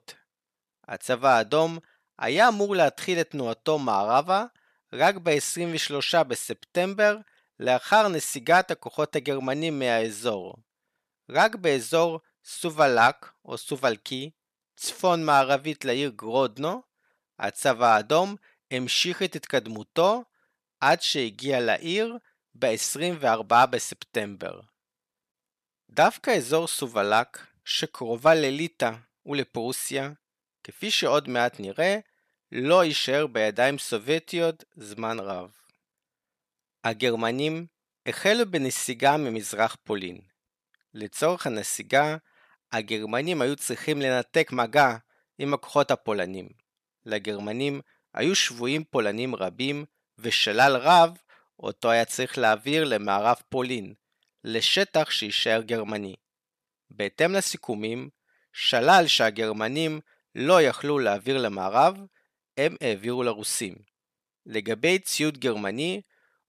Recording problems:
none

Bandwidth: 14 kHz